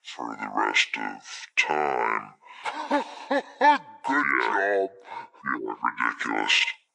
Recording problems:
wrong speed and pitch; too slow and too low; 0.6 times normal speed
thin; somewhat; fading below 350 Hz

